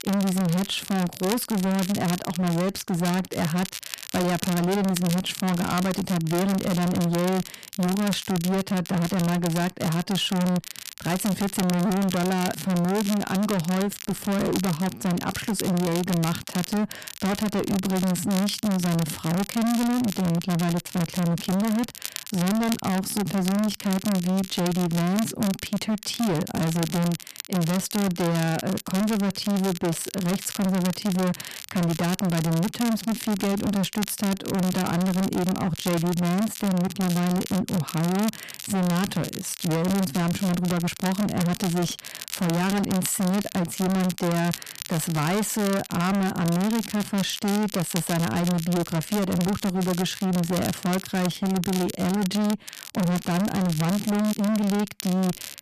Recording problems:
distortion; heavy; 35% of the sound clipped
crackle, like an old record; noticeable; 10 dB below the speech

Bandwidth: 14.5 kHz